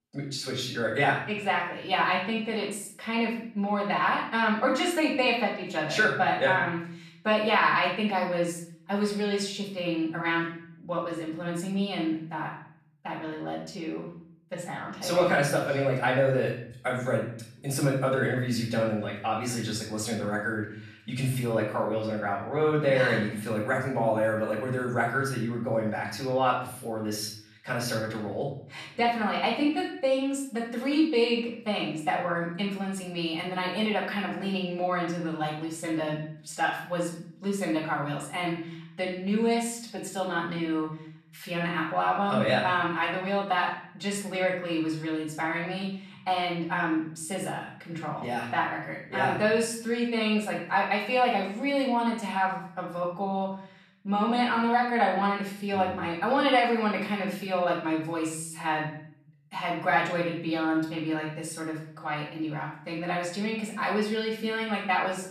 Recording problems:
off-mic speech; far
room echo; noticeable; dies away in 0.6 s

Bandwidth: 13.5 kHz